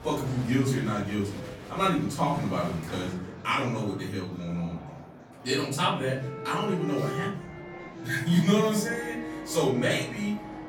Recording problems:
off-mic speech; far
room echo; noticeable; dies away in 0.7 s
background music; noticeable; from 6 s on; 10 dB below the speech
murmuring crowd; noticeable; throughout; 15 dB below the speech

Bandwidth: 18 kHz